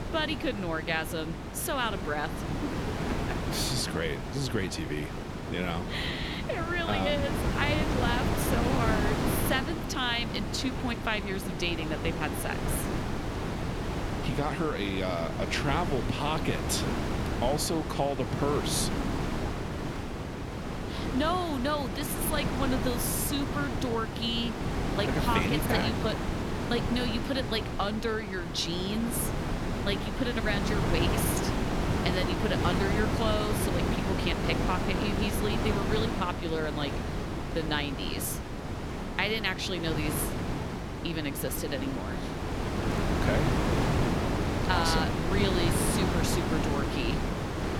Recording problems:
wind noise on the microphone; heavy; 3 dB below the speech

